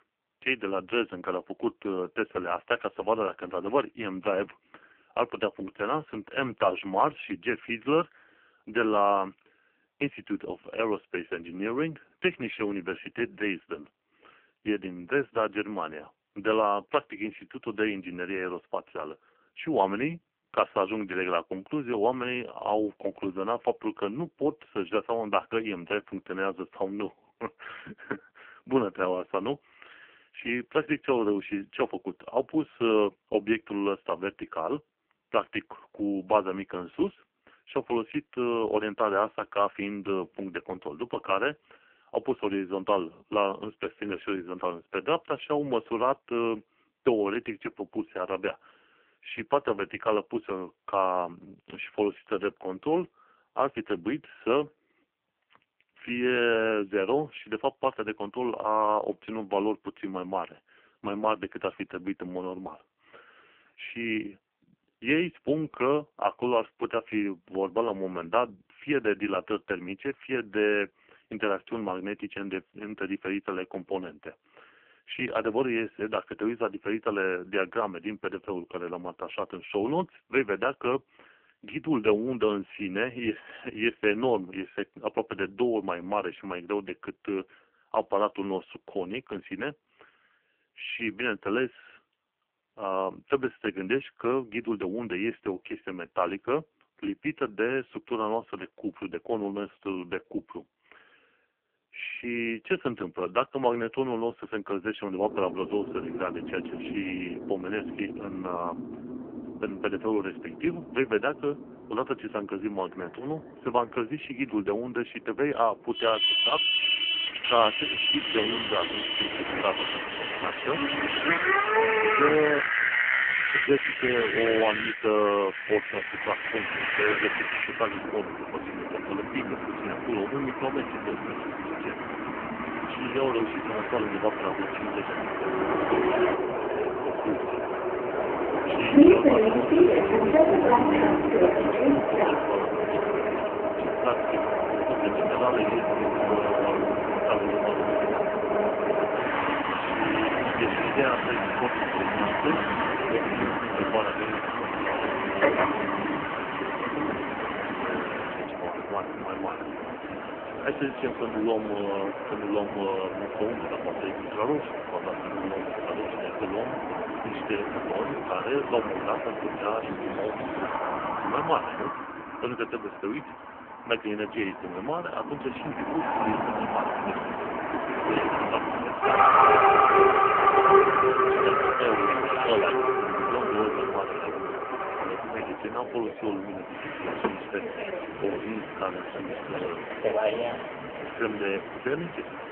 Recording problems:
phone-call audio; poor line; nothing above 3 kHz
traffic noise; very loud; from 1:45 on; 4 dB above the speech

